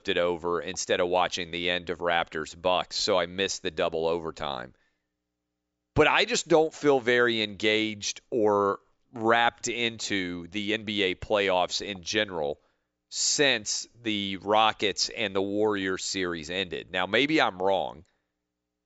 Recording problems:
high frequencies cut off; noticeable; nothing above 8 kHz

